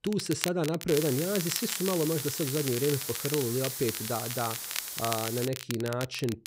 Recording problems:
hiss; loud; from 1 to 5.5 s; 4 dB below the speech
crackle, like an old record; loud; 6 dB below the speech

